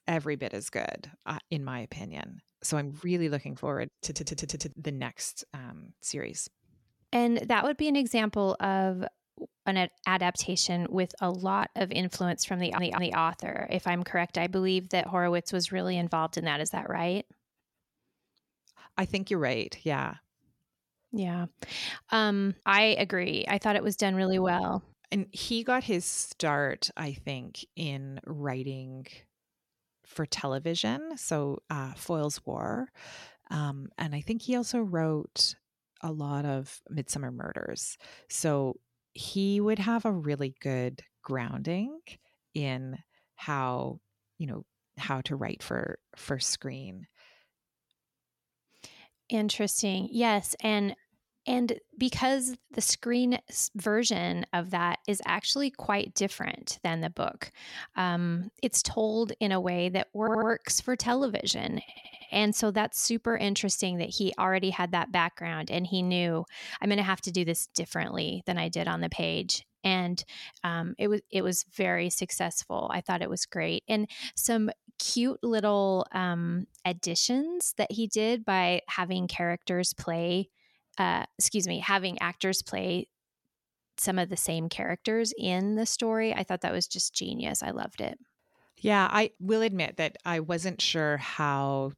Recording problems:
audio stuttering; 4 times, first at 4 s

